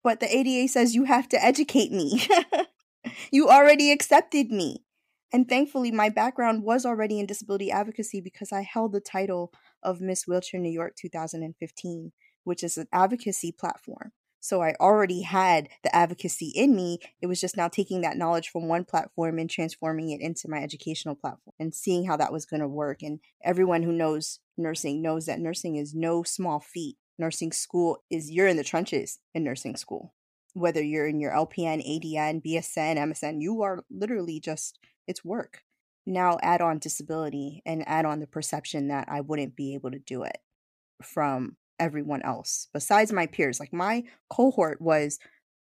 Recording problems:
none

